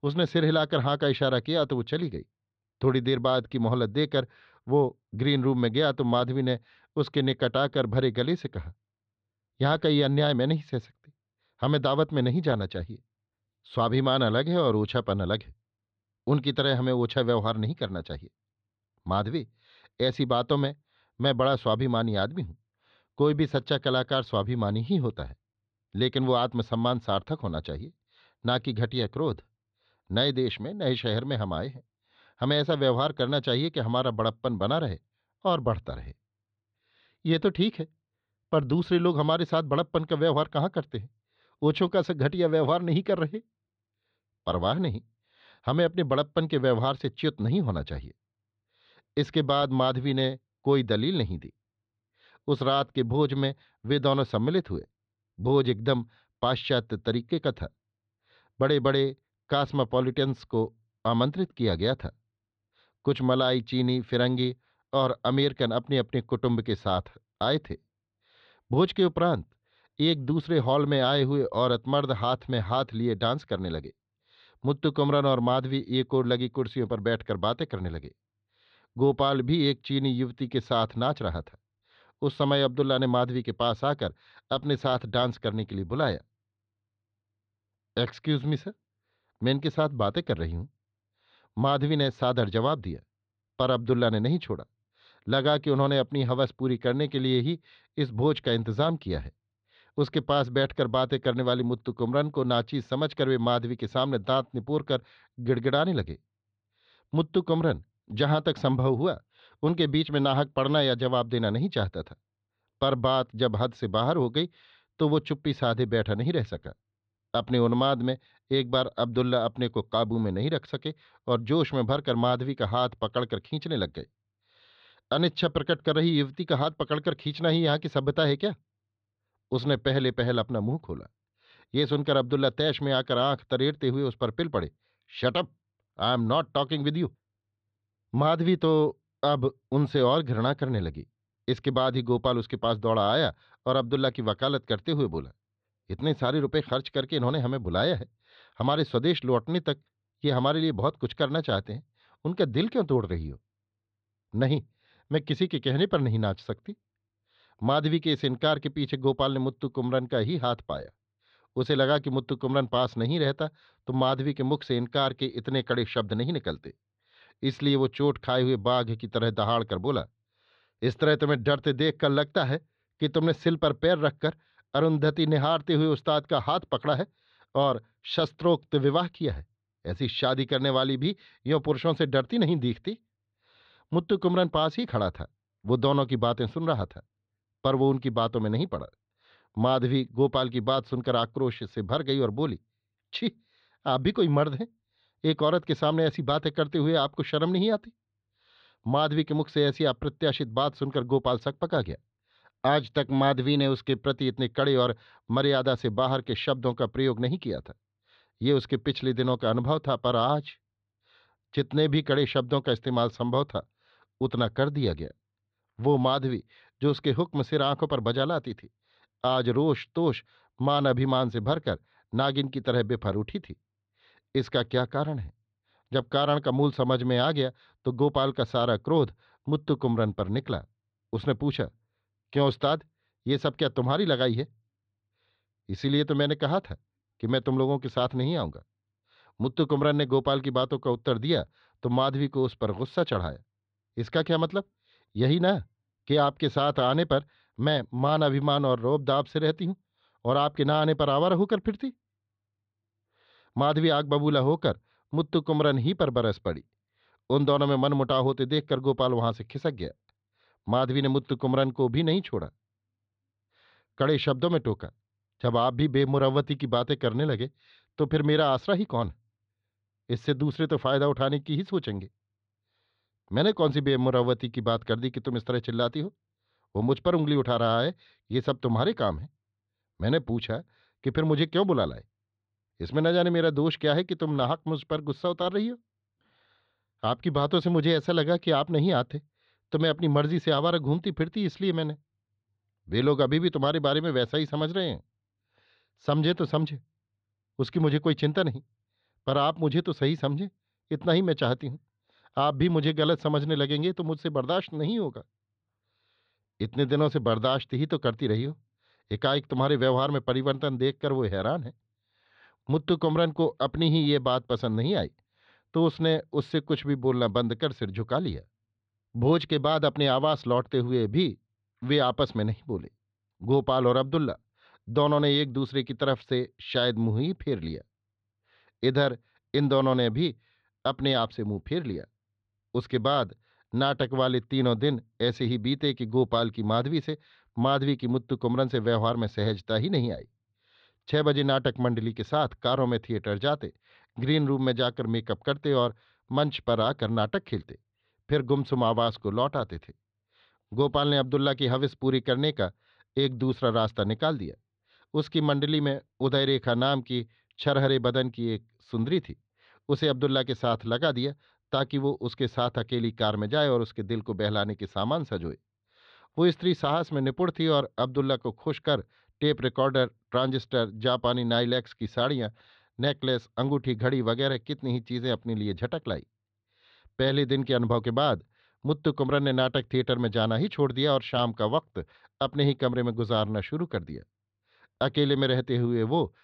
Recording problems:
muffled; slightly; fading above 4 kHz

